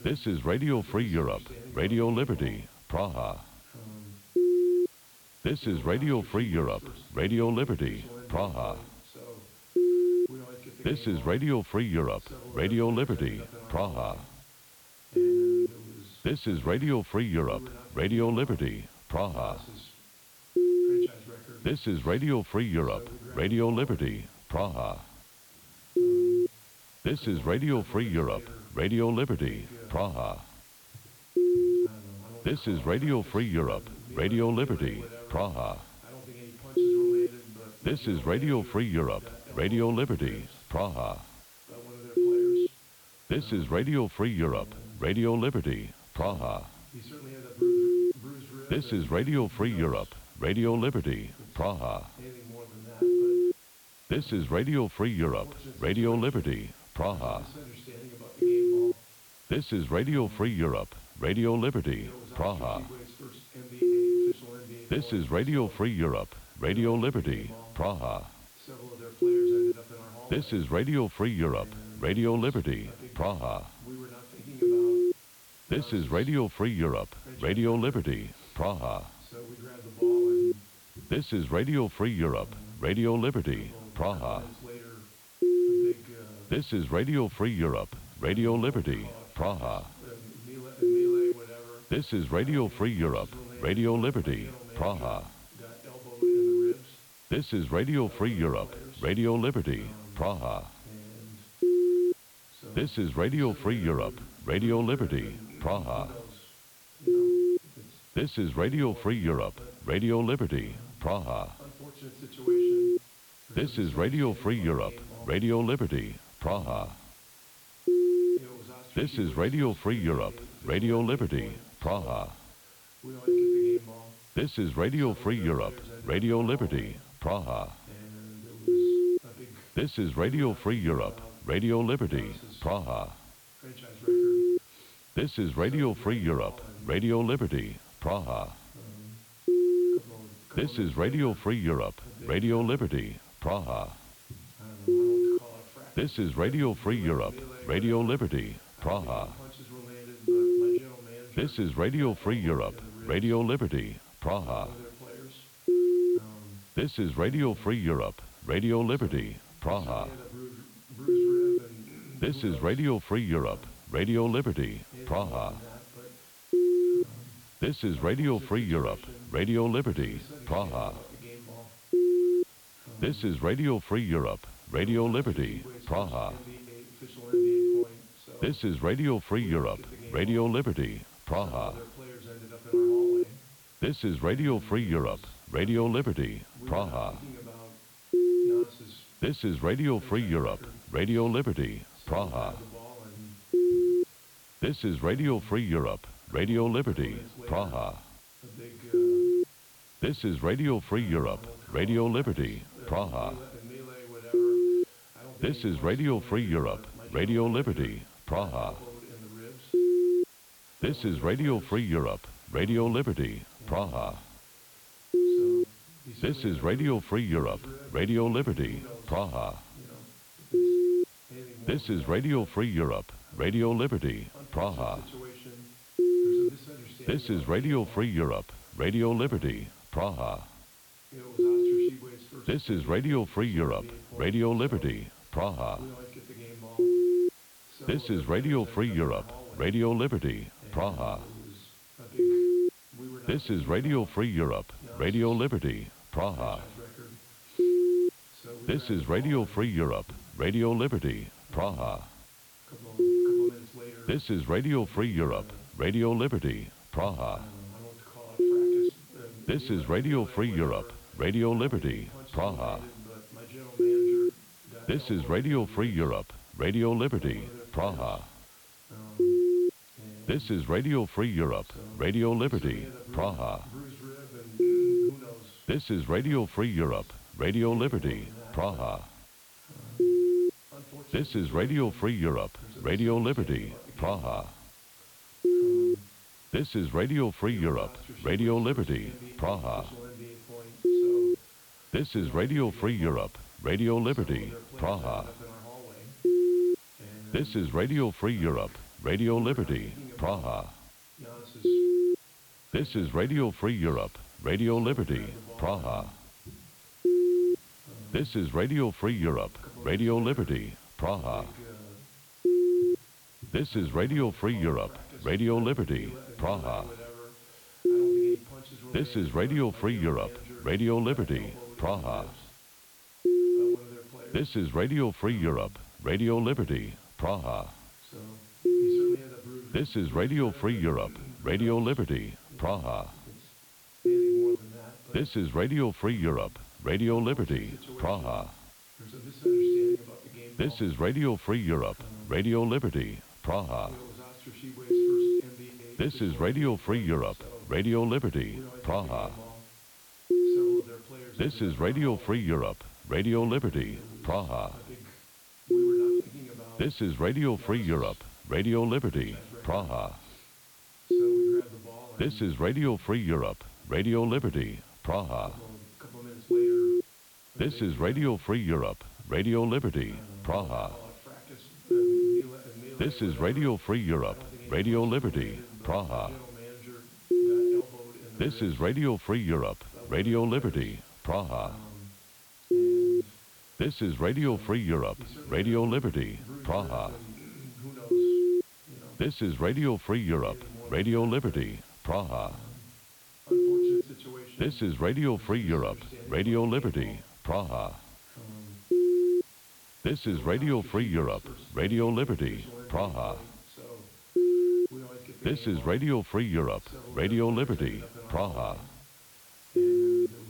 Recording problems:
muffled; very slightly; fading above 4 kHz
voice in the background; noticeable; throughout; 20 dB below the speech
hiss; faint; throughout; 25 dB below the speech

